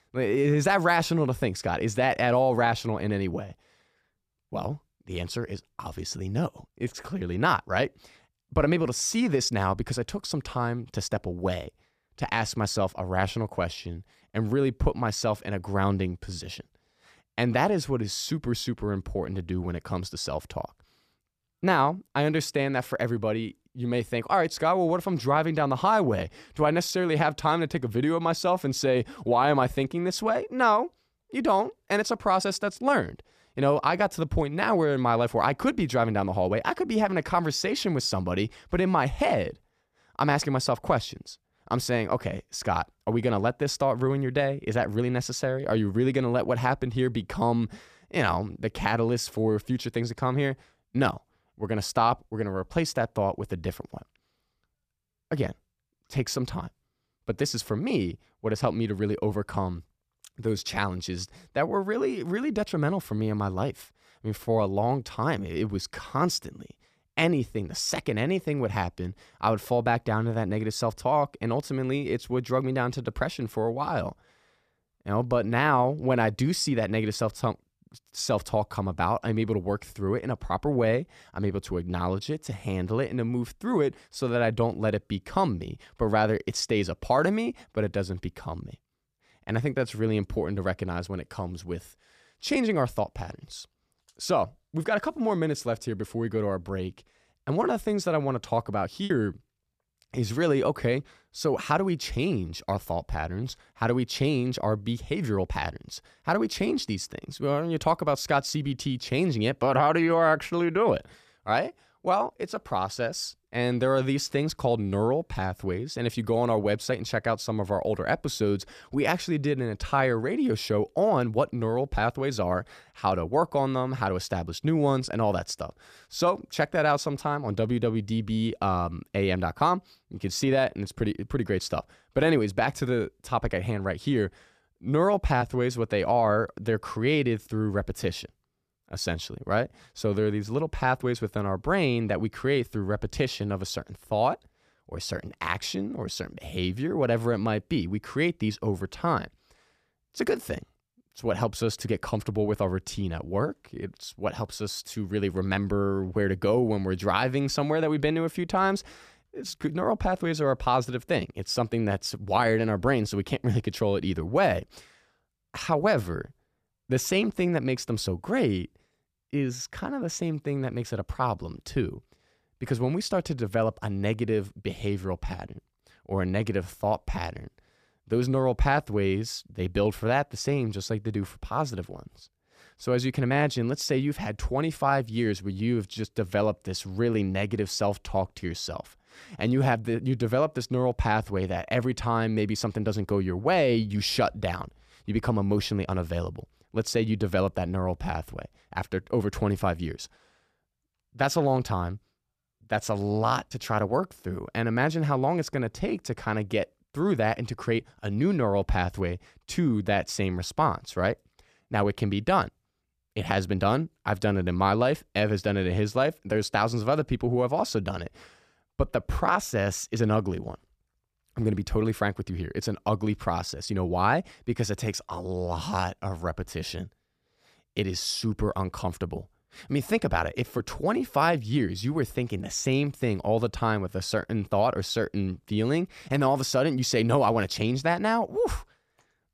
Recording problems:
choppy; occasionally; at 1:39; 2% of the speech affected

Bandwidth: 14.5 kHz